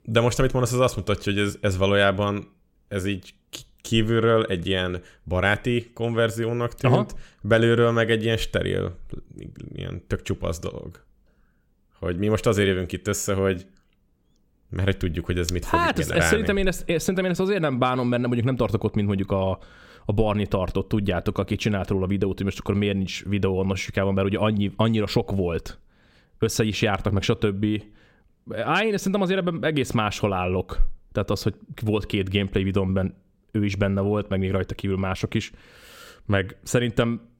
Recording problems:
none

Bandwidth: 16.5 kHz